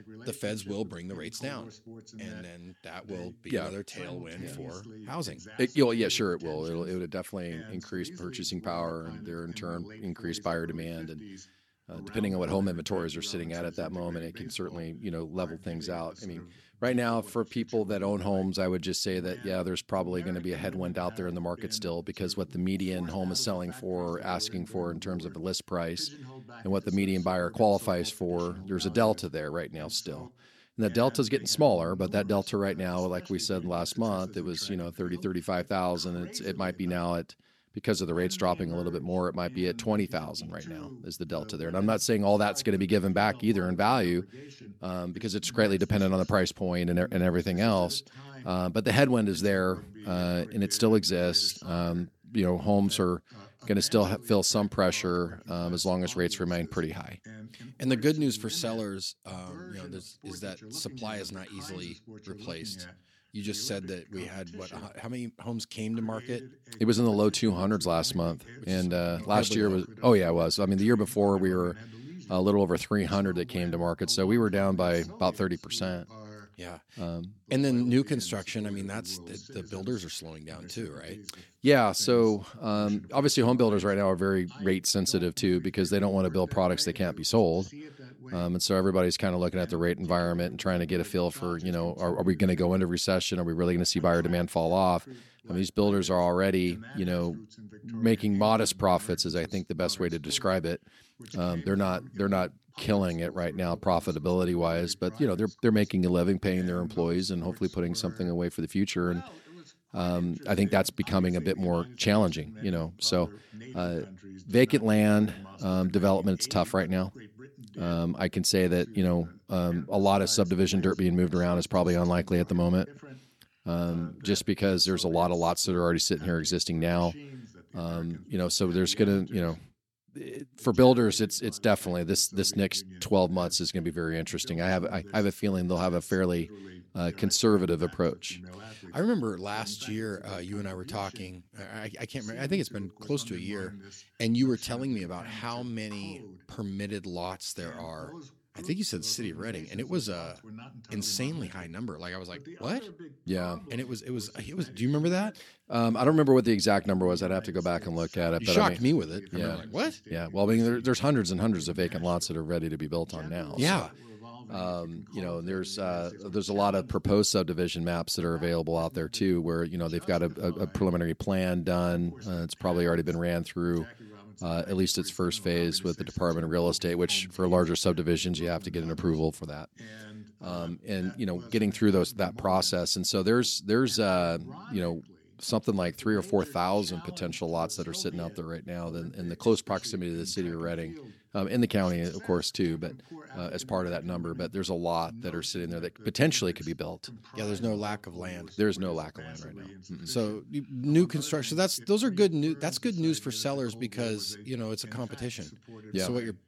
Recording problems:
voice in the background; noticeable; throughout; 20 dB below the speech

